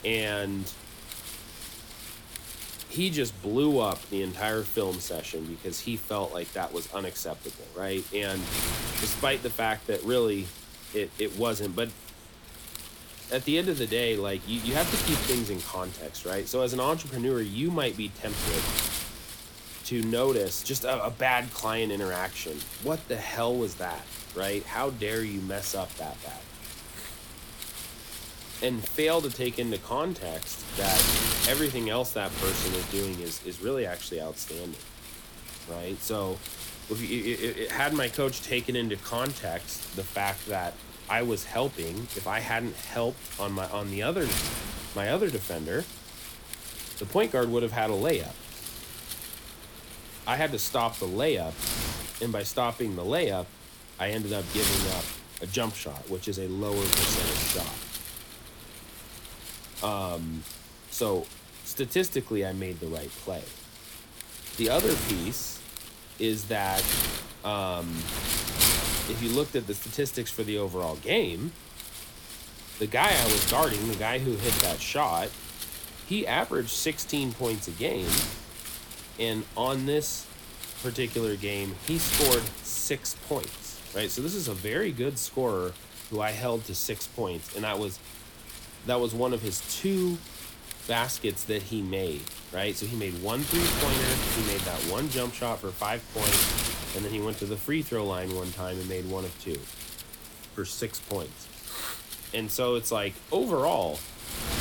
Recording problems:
wind noise on the microphone; heavy; 5 dB below the speech

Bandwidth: 18 kHz